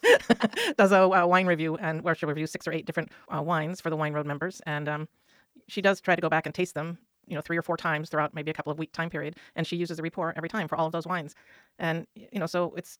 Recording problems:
wrong speed, natural pitch; too fast; 1.5 times normal speed

